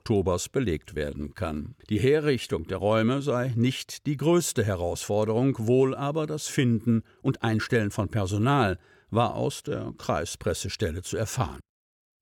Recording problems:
uneven, jittery; slightly; from 1 to 10 s

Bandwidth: 17.5 kHz